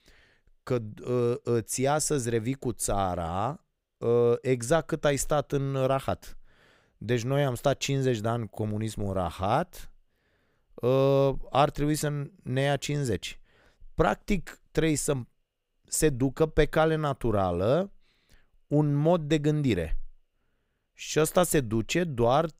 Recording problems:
none

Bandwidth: 15.5 kHz